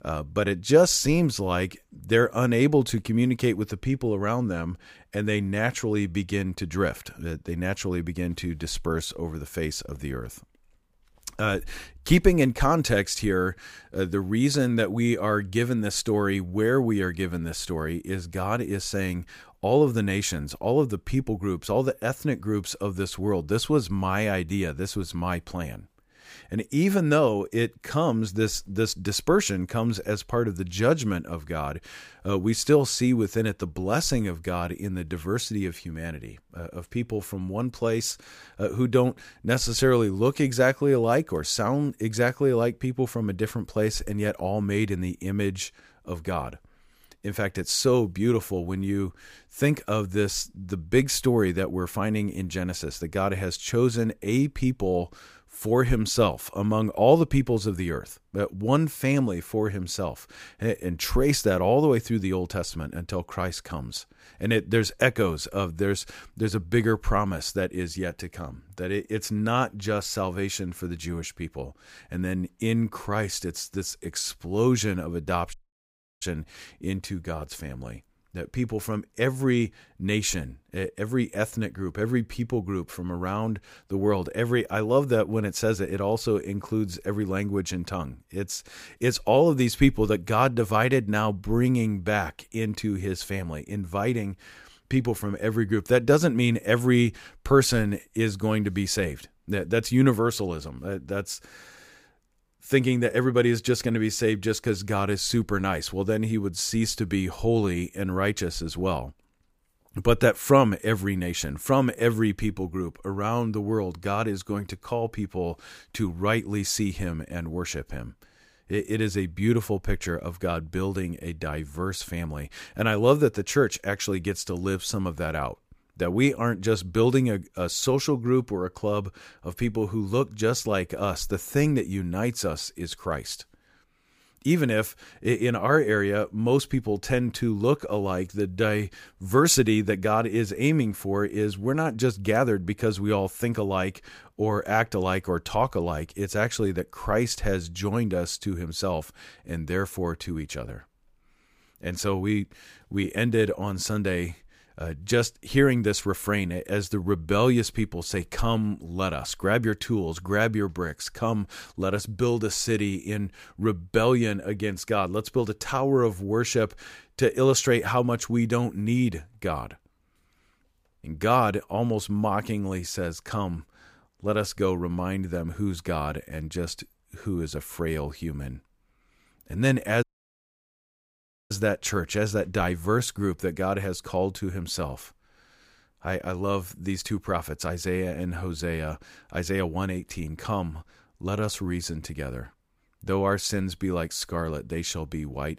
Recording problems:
audio cutting out; at 1:16 for 0.5 s and at 3:00 for 1.5 s

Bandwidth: 15 kHz